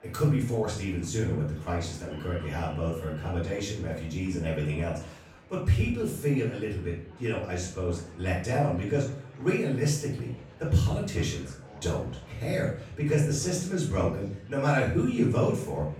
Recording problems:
off-mic speech; far
room echo; noticeable; dies away in 0.5 s
chatter from many people; faint; throughout; 20 dB below the speech

